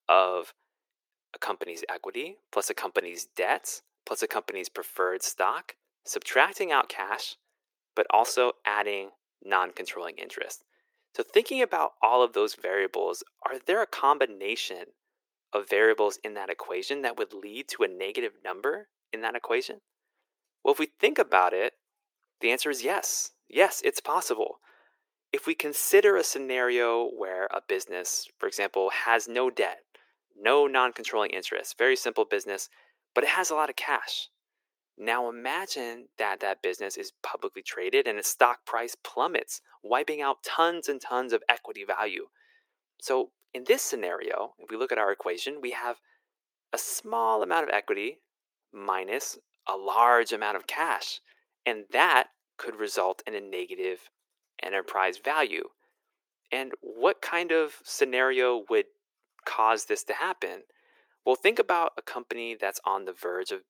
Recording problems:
thin; very; fading below 350 Hz

